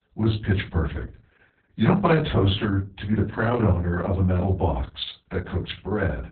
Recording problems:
off-mic speech; far
garbled, watery; badly; nothing above 4 kHz
room echo; very slight; dies away in 0.3 s

